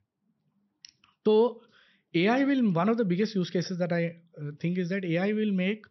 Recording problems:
high frequencies cut off; noticeable; nothing above 6 kHz

